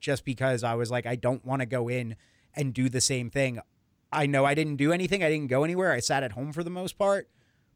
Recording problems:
none

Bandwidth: 18 kHz